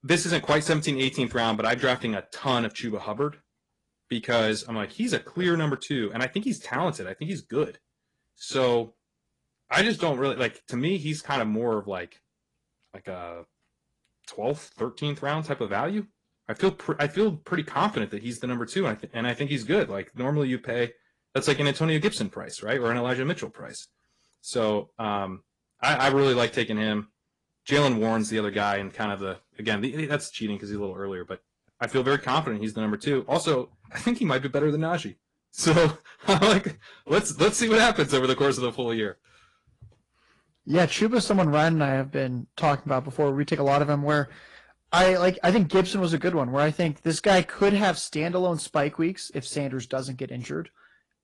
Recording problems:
distortion; slight; 3% of the sound clipped
garbled, watery; slightly; nothing above 10 kHz

